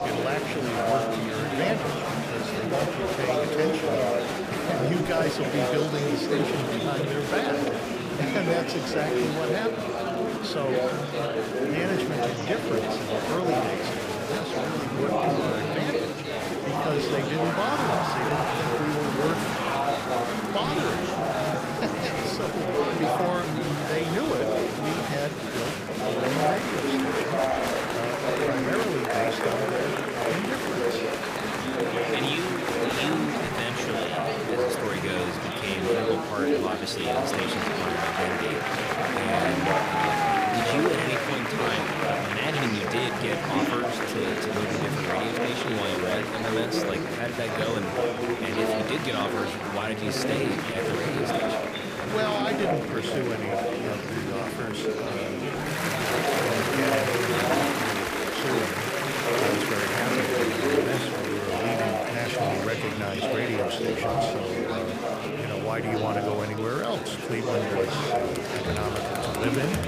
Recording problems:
murmuring crowd; very loud; throughout; 5 dB above the speech
crackle, like an old record; faint; 25 dB below the speech

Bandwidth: 15 kHz